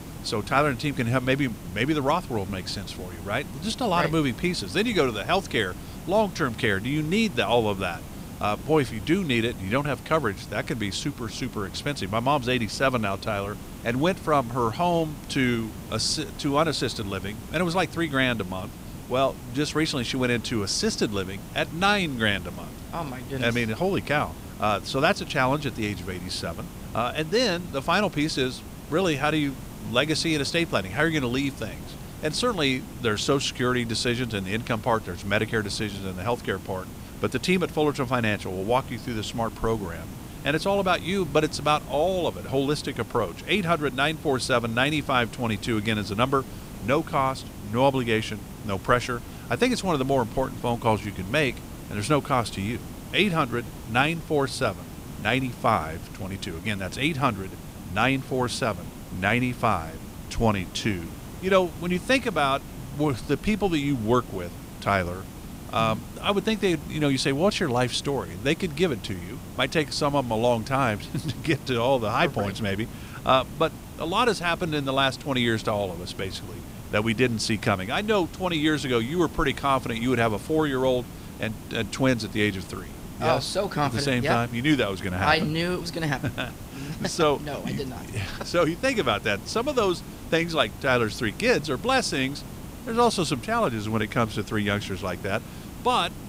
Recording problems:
hiss; noticeable; throughout; 15 dB below the speech

